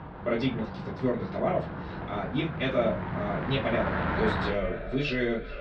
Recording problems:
echo of what is said; strong; from 3.5 s on; 430 ms later, 9 dB below the speech
off-mic speech; far
muffled; slightly; fading above 4 kHz
room echo; very slight; dies away in 0.2 s
traffic noise; loud; throughout; 4 dB below the speech

